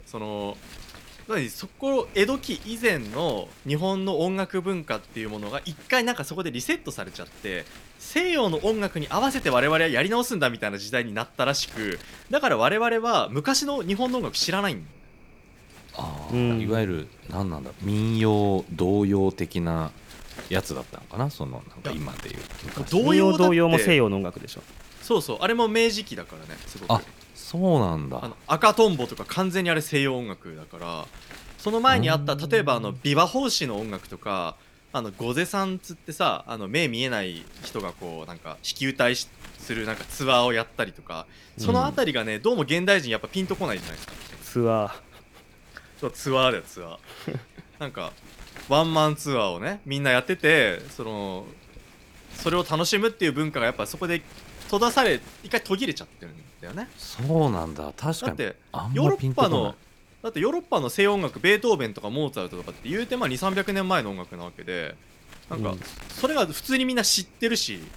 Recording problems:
wind noise on the microphone; occasional gusts; 20 dB below the speech

